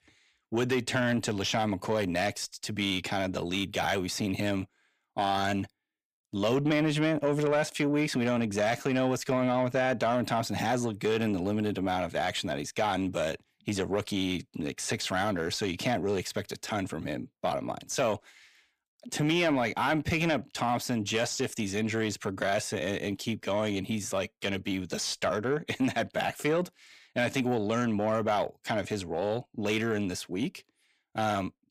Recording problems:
distortion; slight; 10 dB below the speech

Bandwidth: 15 kHz